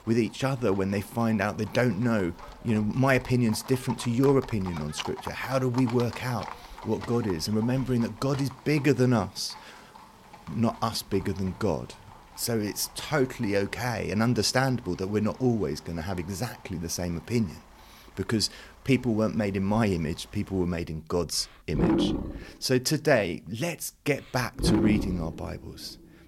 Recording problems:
animal sounds; loud; throughout; 8 dB below the speech

